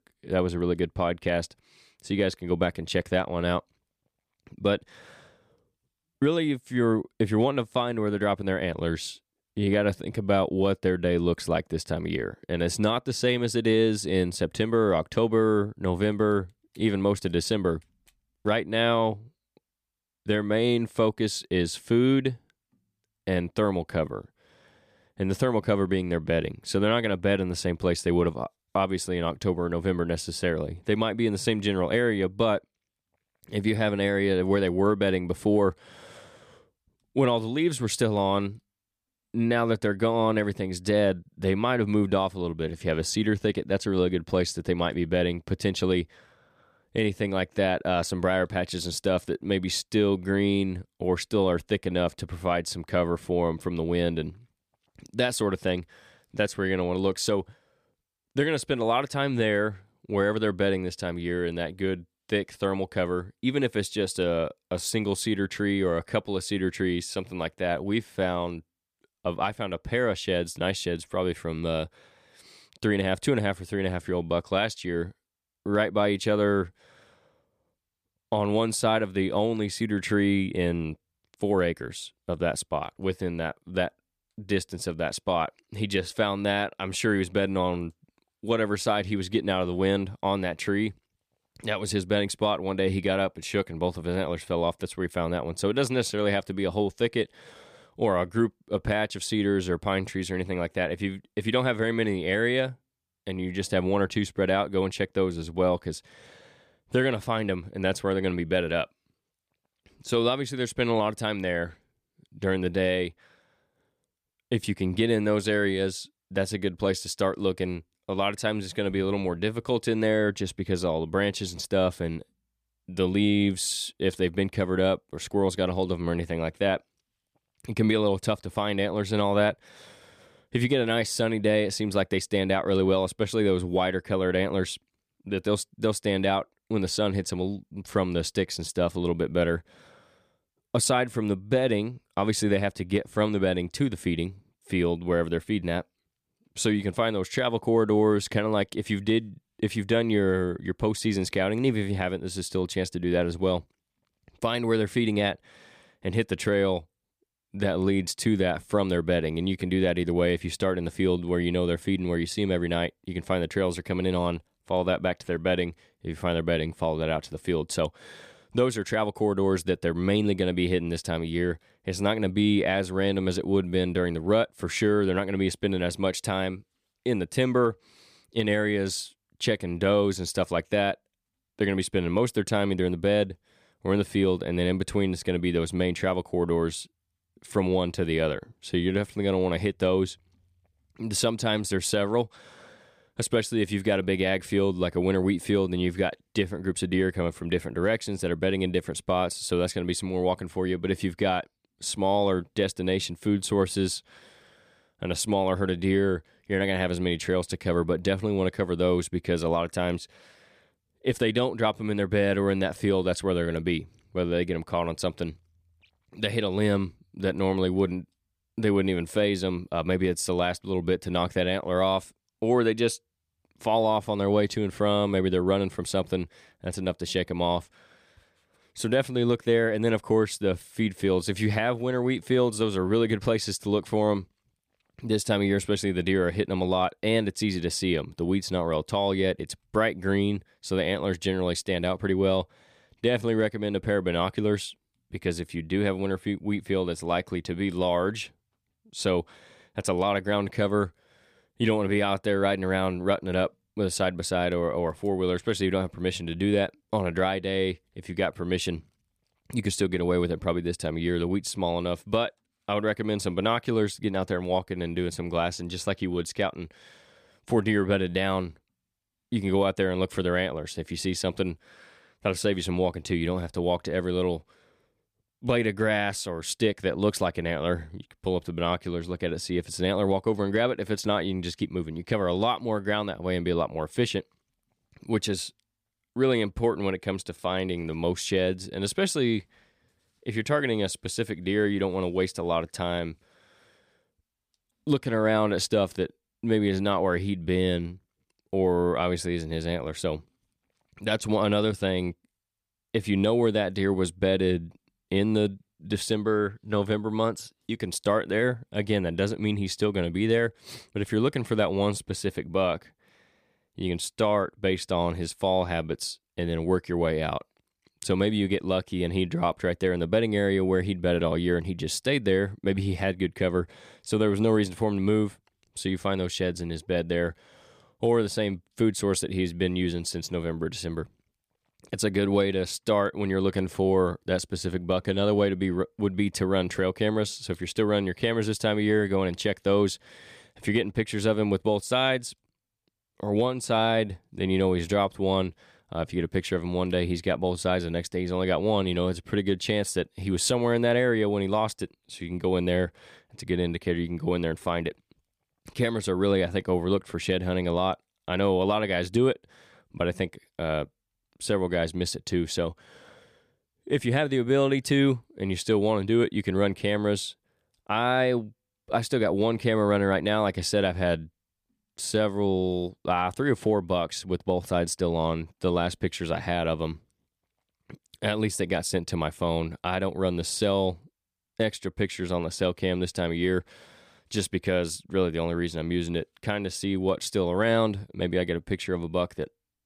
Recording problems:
none

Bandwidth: 15 kHz